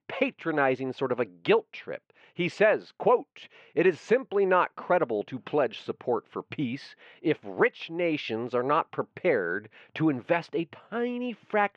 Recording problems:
muffled; very; fading above 3 kHz

